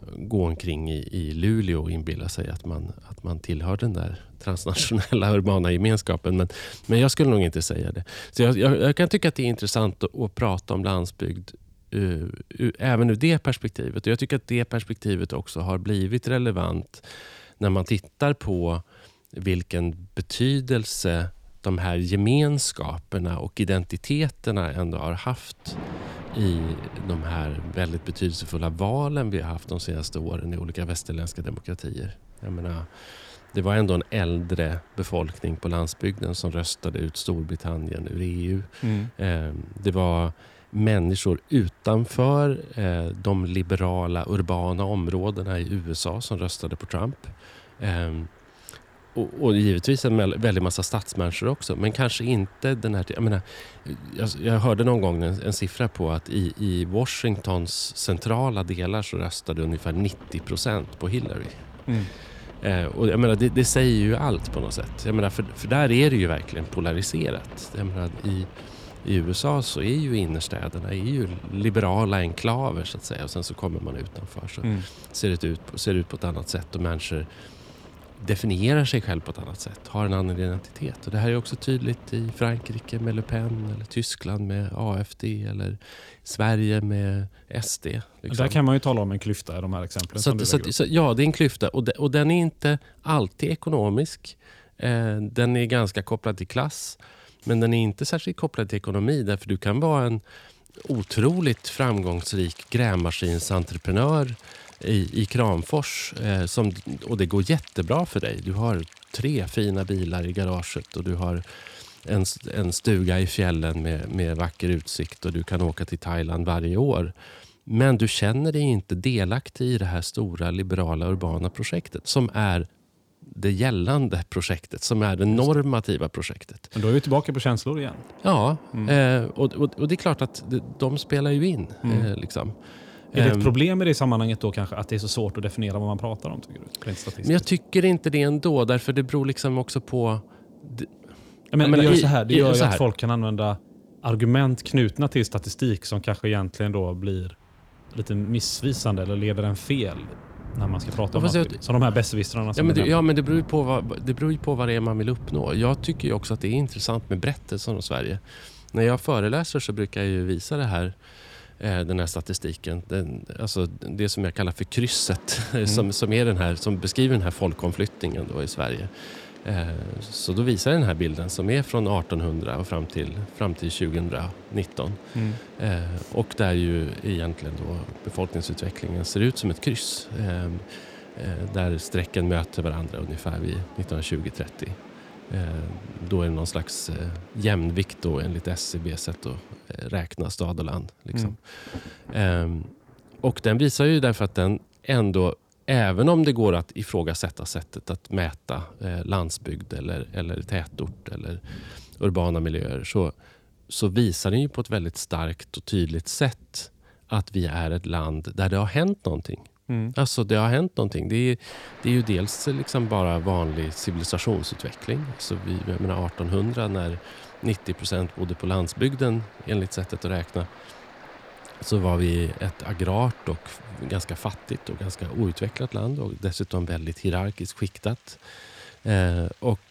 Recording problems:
rain or running water; noticeable; throughout; 20 dB below the speech

